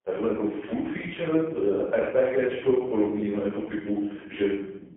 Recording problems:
phone-call audio; poor line; nothing above 3.5 kHz
off-mic speech; far
room echo; noticeable; dies away in 0.7 s

